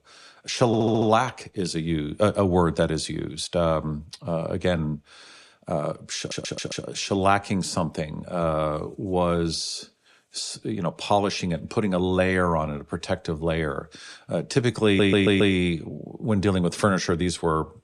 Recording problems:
audio stuttering; at 0.5 s, at 6 s and at 15 s

